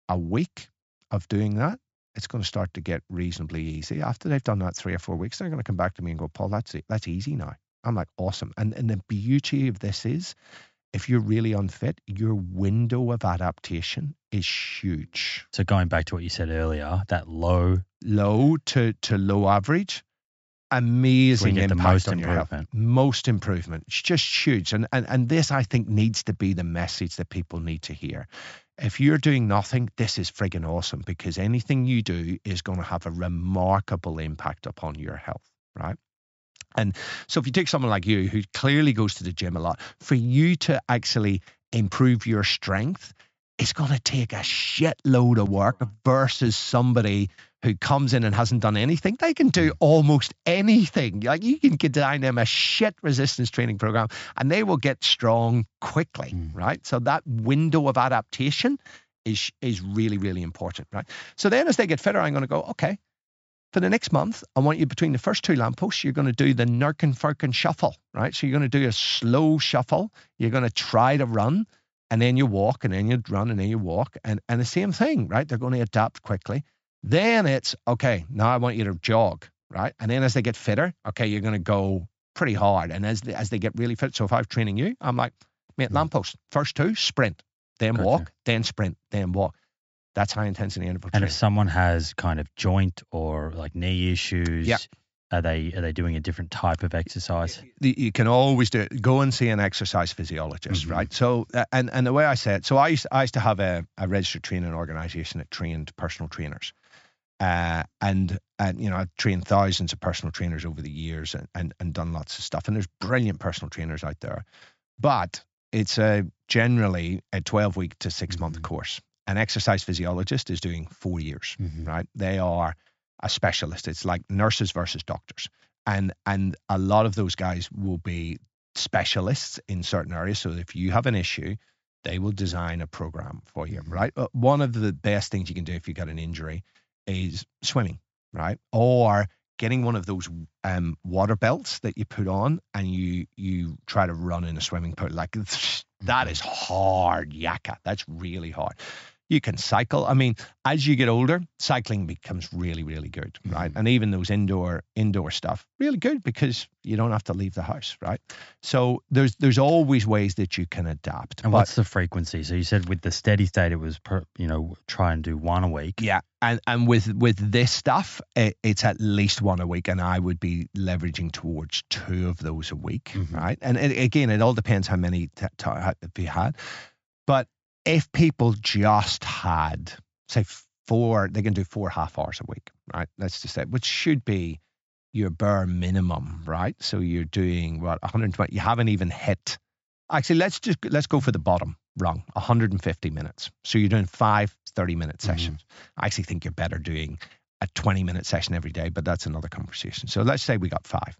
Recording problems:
high frequencies cut off; noticeable; nothing above 8 kHz

